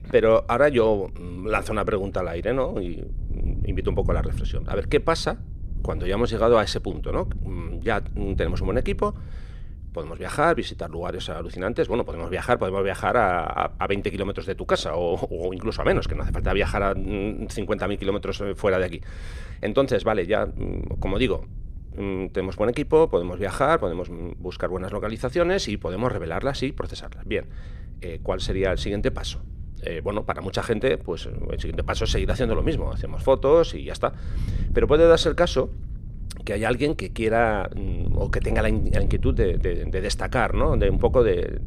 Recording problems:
wind noise on the microphone; occasional gusts; 25 dB below the speech

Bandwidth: 14.5 kHz